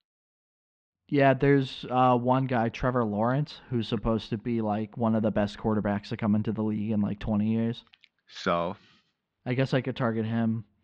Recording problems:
muffled; slightly; fading above 4 kHz

